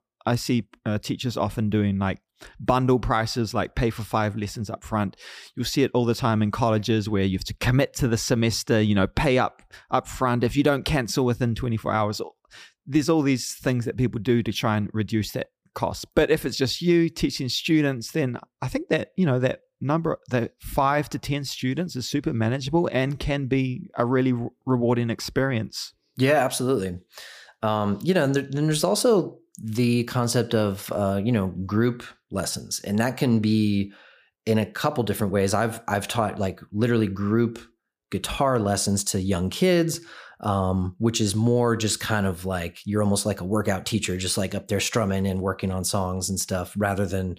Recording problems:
none

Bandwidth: 15 kHz